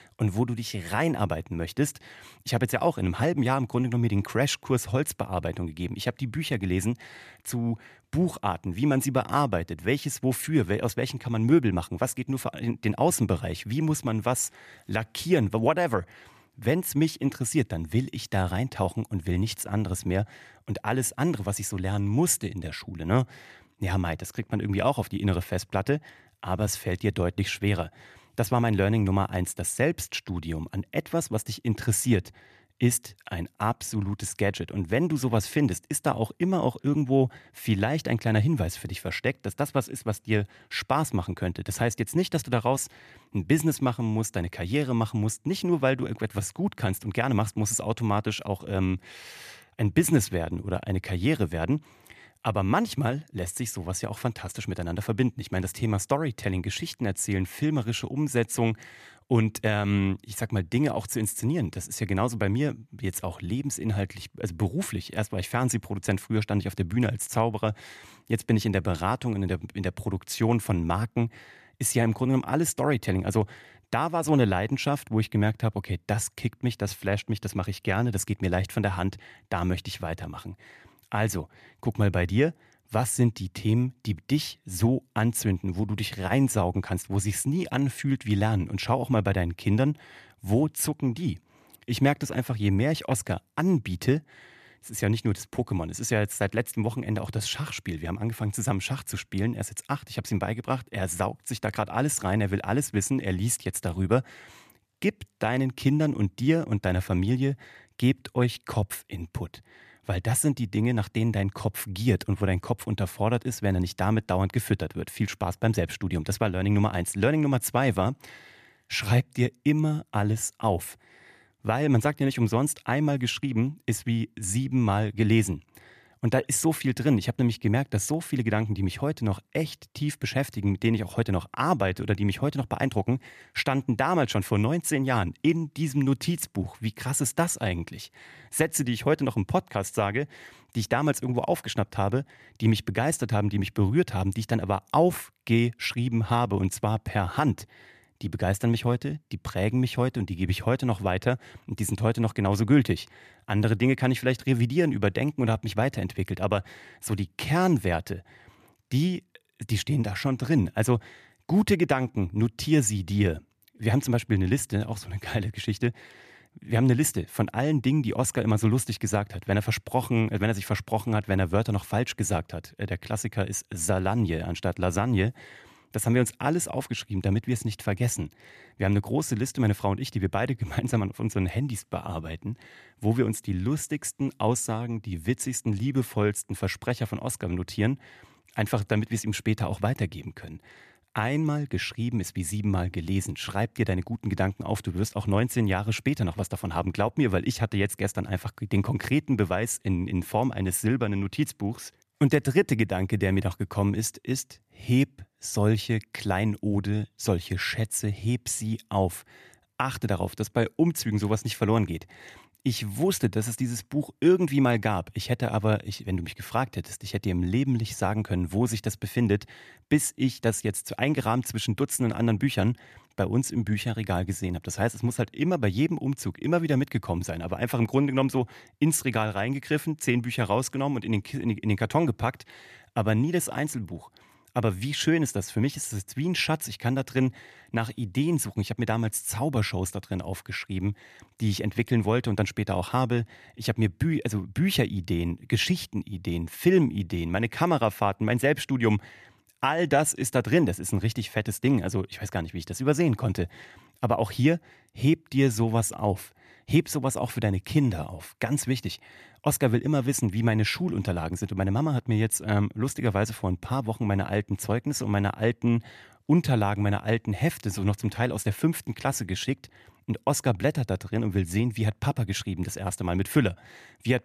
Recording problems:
none

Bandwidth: 14.5 kHz